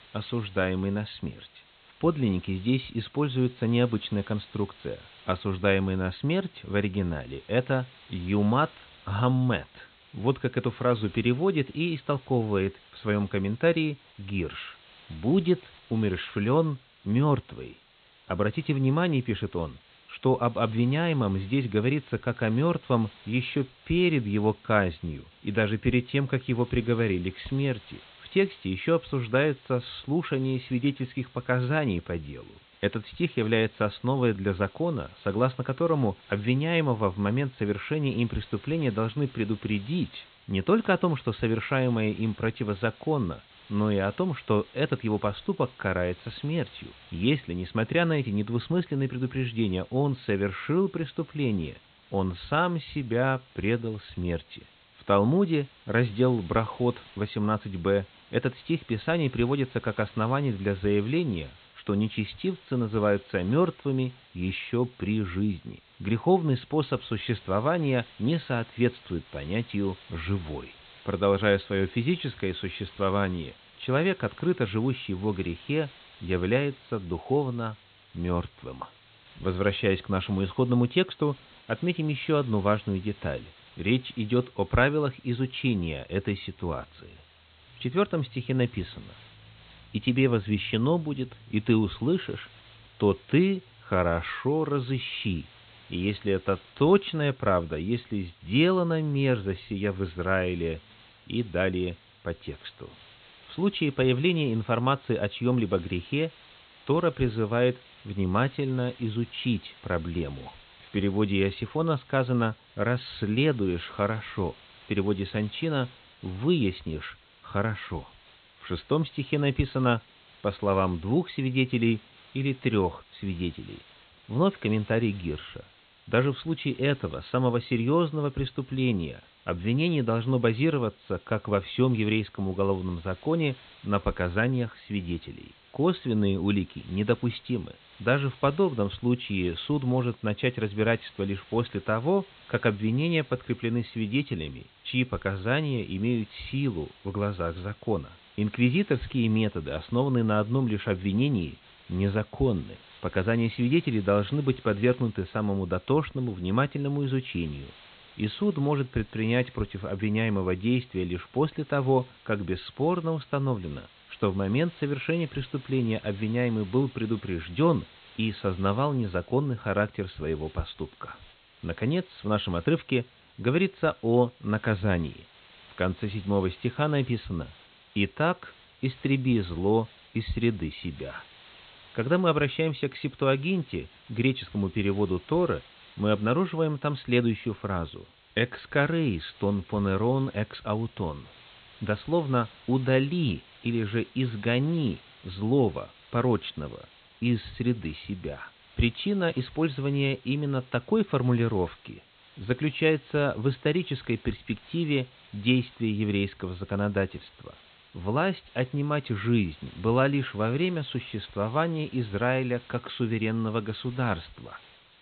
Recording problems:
high frequencies cut off; severe; nothing above 4 kHz
hiss; faint; throughout; 25 dB below the speech

